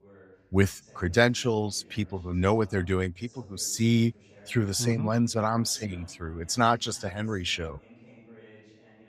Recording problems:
voice in the background; faint; throughout; 25 dB below the speech

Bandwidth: 15.5 kHz